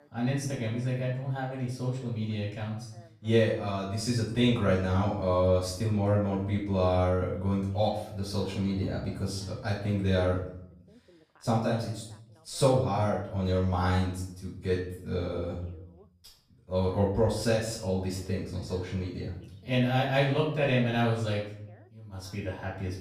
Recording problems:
off-mic speech; far
room echo; noticeable; dies away in 0.6 s
voice in the background; faint; throughout; 30 dB below the speech

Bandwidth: 15 kHz